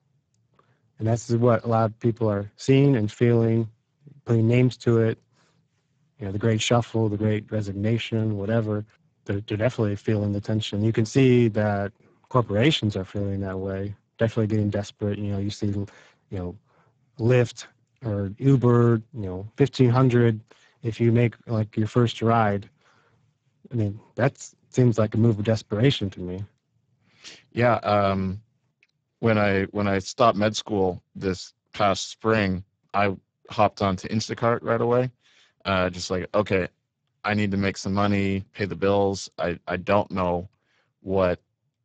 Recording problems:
garbled, watery; badly; nothing above 7.5 kHz

